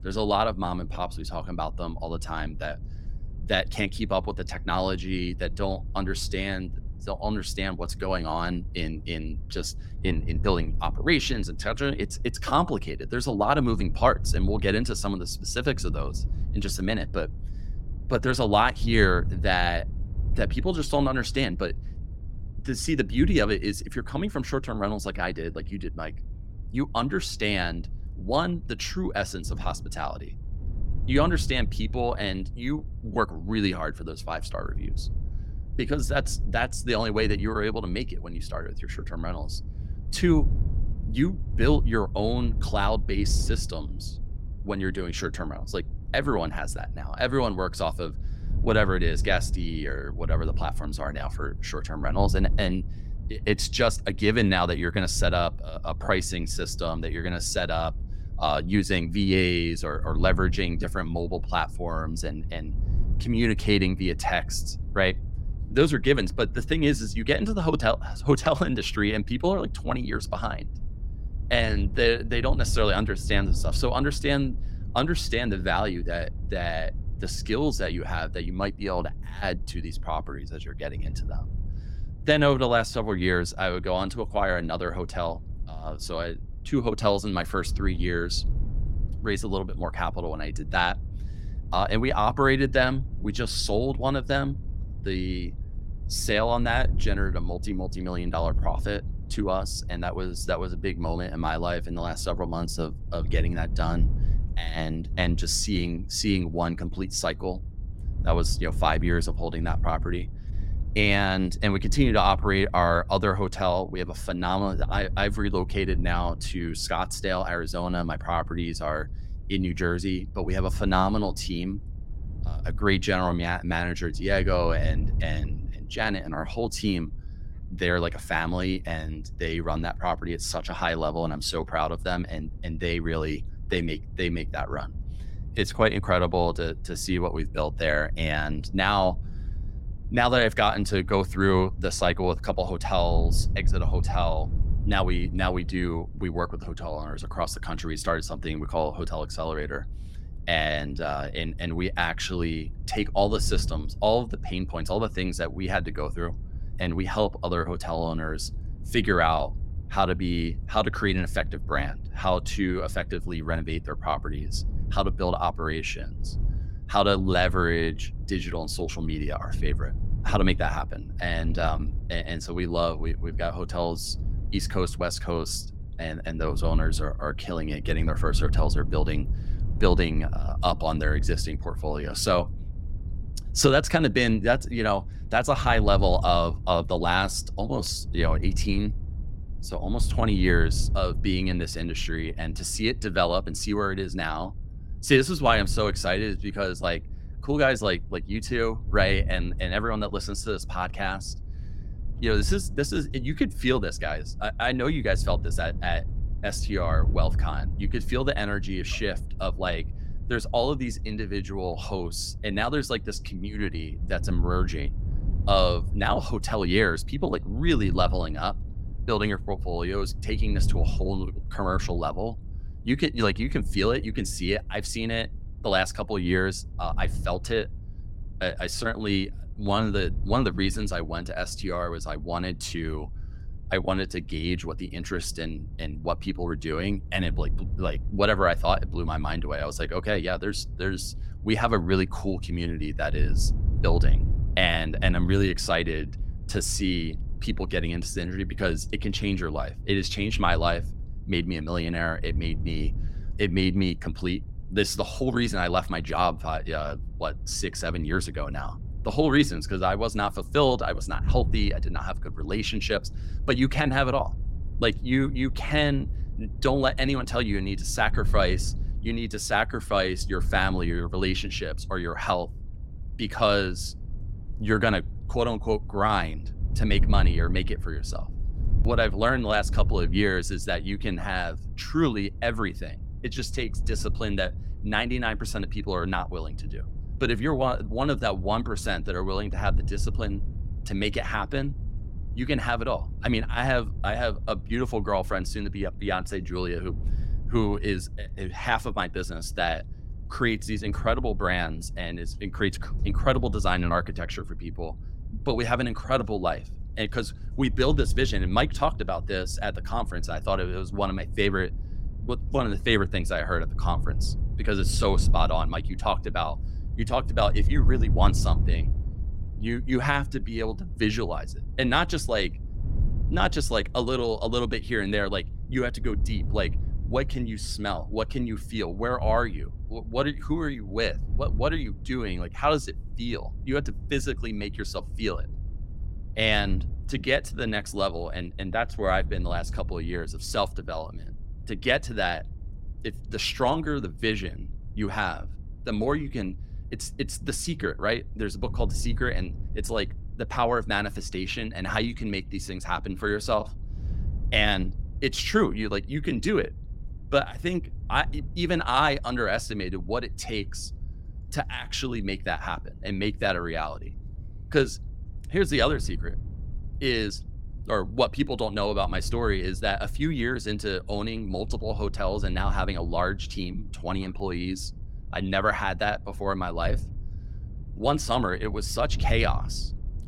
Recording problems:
wind noise on the microphone; occasional gusts; 20 dB below the speech

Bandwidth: 16 kHz